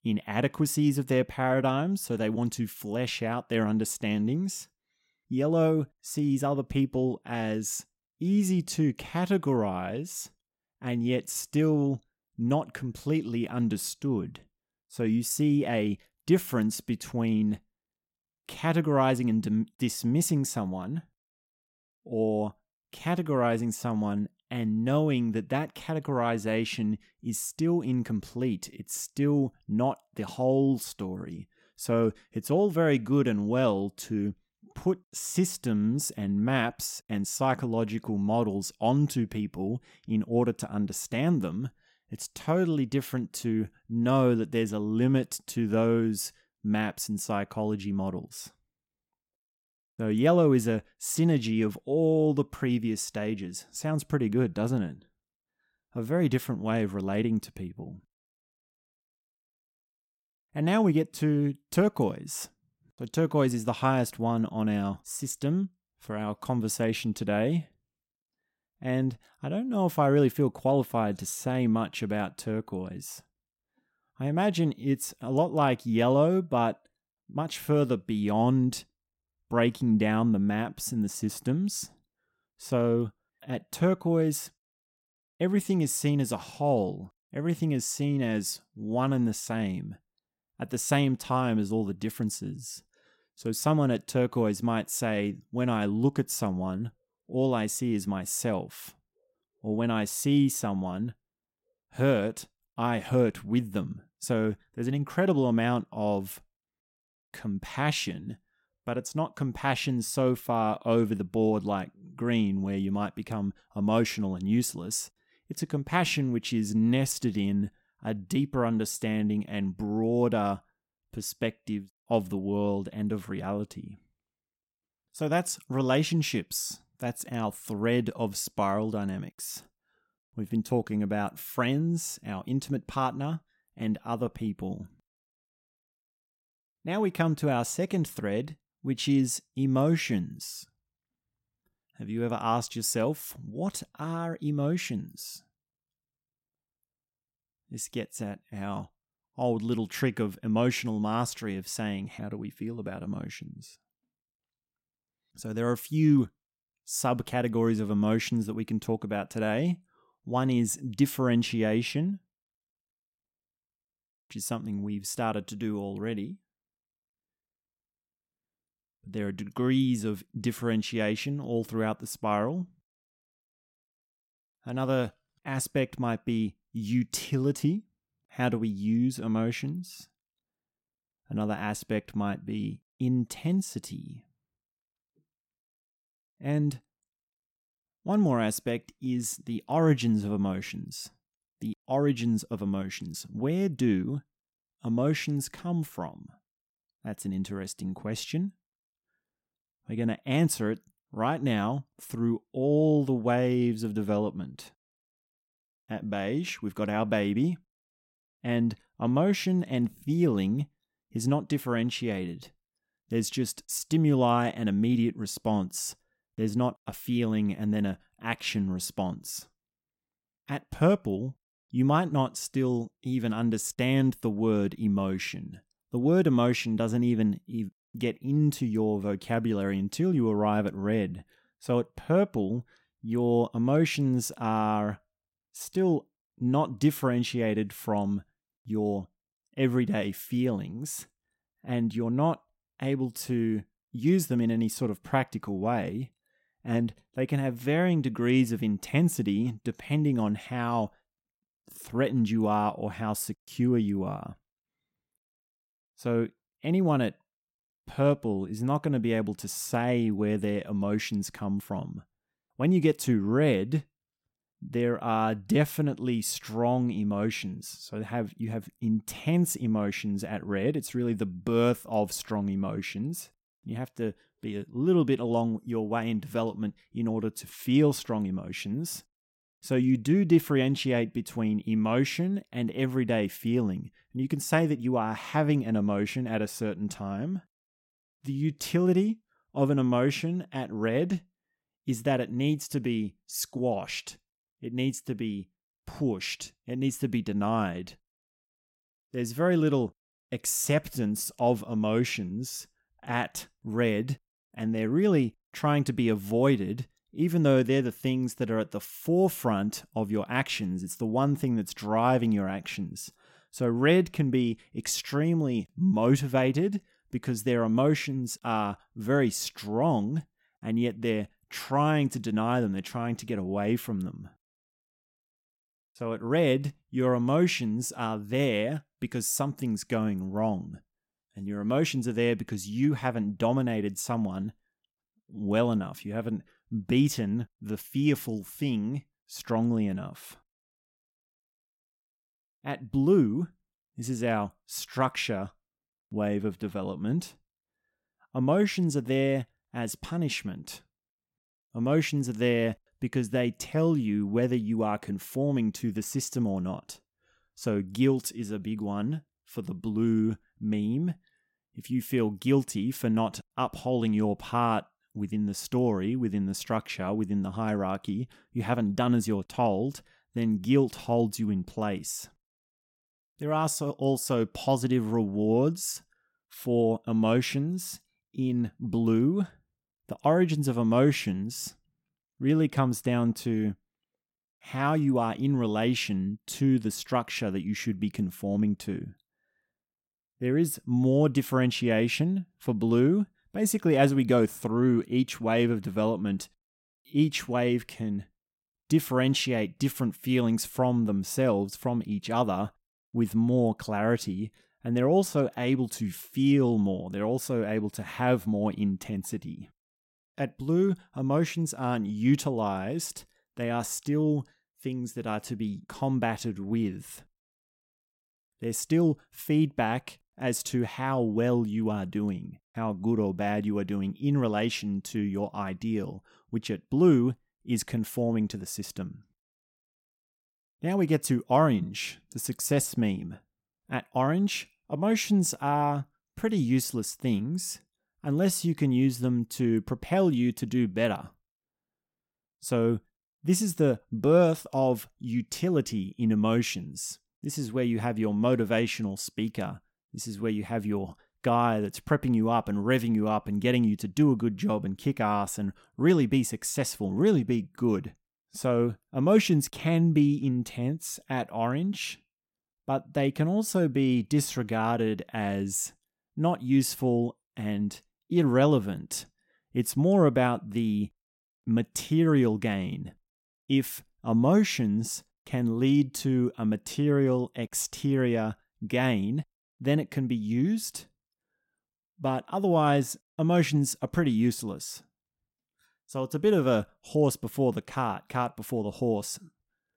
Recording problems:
none

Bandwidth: 16.5 kHz